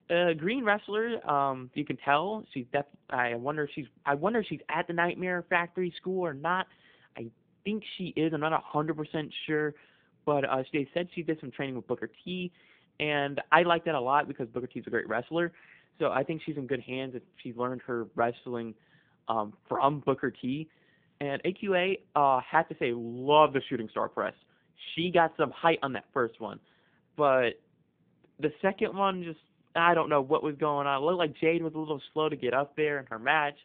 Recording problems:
phone-call audio

